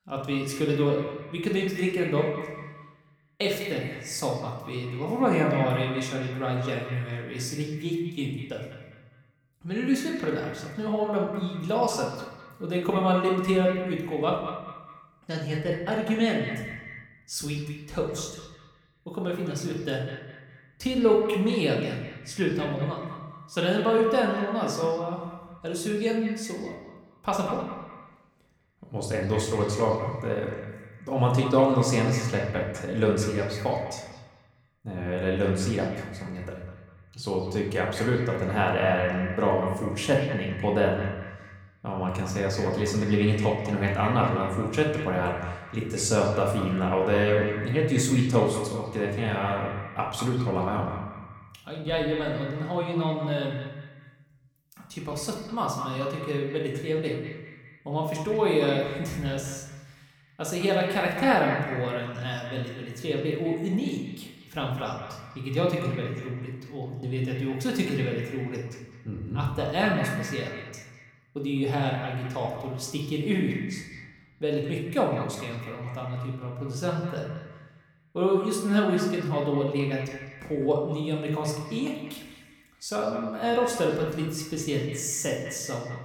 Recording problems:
echo of what is said; noticeable; throughout; 200 ms later, 15 dB below the speech
room echo; noticeable; dies away in 0.8 s
off-mic speech; somewhat distant

